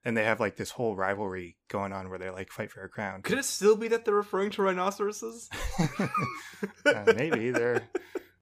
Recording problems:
none

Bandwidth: 15 kHz